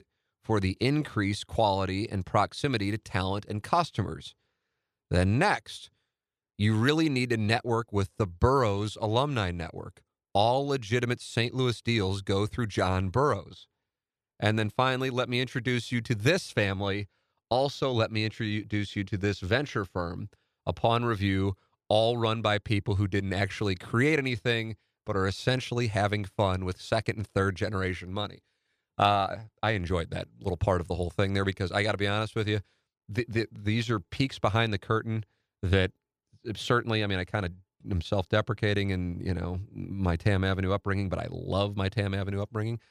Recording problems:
none

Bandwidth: 14 kHz